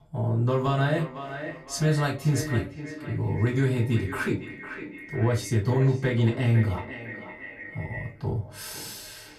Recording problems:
off-mic speech; far
echo of what is said; noticeable; throughout; 510 ms later, 10 dB below the speech
room echo; very slight; dies away in 0.2 s

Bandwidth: 14.5 kHz